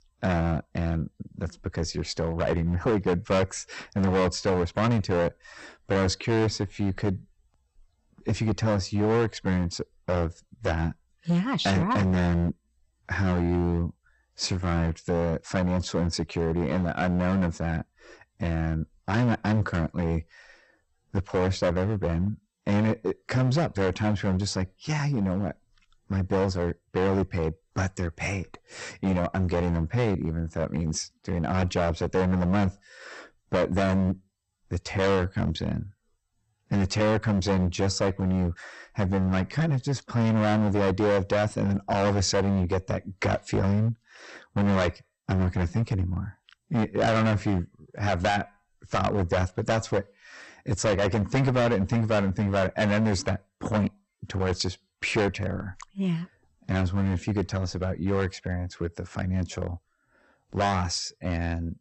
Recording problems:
distortion; heavy; 11% of the sound clipped
garbled, watery; slightly; nothing above 8 kHz

